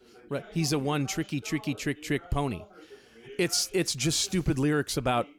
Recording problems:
voice in the background; faint; throughout; 20 dB below the speech

